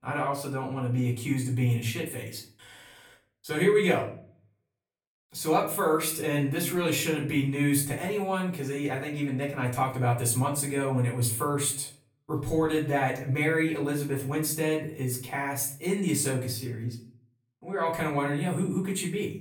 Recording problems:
off-mic speech; far
room echo; slight; dies away in 0.4 s

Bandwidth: 18.5 kHz